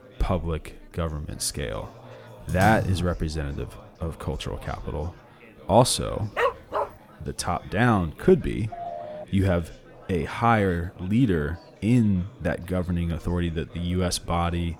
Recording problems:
chatter from many people; faint; throughout; 20 dB below the speech
keyboard typing; noticeable; at 2.5 s; peak 3 dB below the speech
dog barking; noticeable; at 6.5 s; peak level with the speech
phone ringing; noticeable; at 8.5 s; peak 10 dB below the speech

